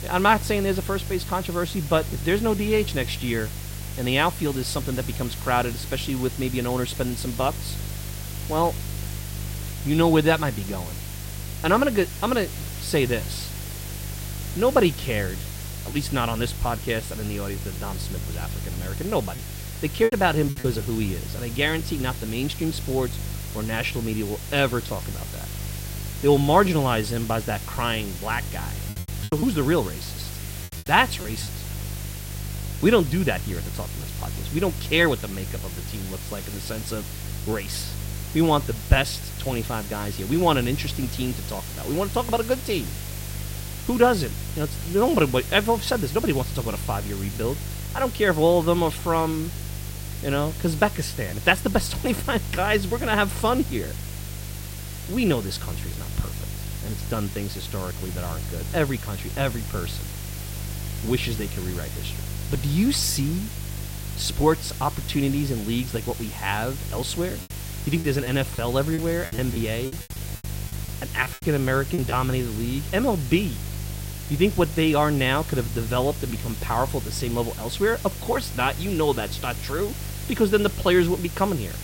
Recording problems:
hiss; noticeable; throughout; 10 dB below the speech
electrical hum; faint; throughout; 50 Hz, 20 dB below the speech
choppy; very; from 19 to 21 s, from 29 to 31 s and from 1:08 to 1:12; 13% of the speech affected

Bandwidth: 16 kHz